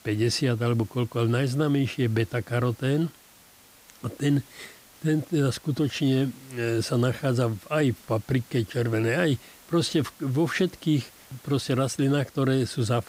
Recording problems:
hiss; faint; throughout; 25 dB below the speech

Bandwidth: 15.5 kHz